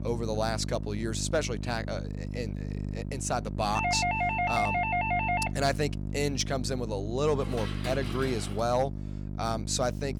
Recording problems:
electrical hum; noticeable; throughout; 50 Hz, 15 dB below the speech
doorbell; loud; from 4 to 5.5 s; peak 4 dB above the speech
clattering dishes; noticeable; from 7.5 to 8.5 s; peak 8 dB below the speech

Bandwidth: 18.5 kHz